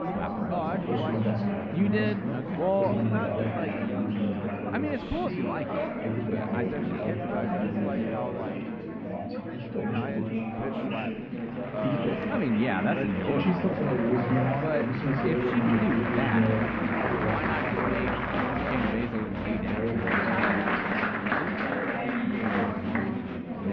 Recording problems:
muffled; very; fading above 3 kHz
murmuring crowd; very loud; throughout; 4 dB above the speech

